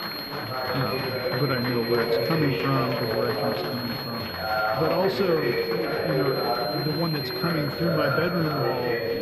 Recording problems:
muffled; very slightly; fading above 3.5 kHz
chatter from many people; very loud; throughout; 1 dB above the speech
high-pitched whine; loud; throughout; 4 kHz, 6 dB below the speech

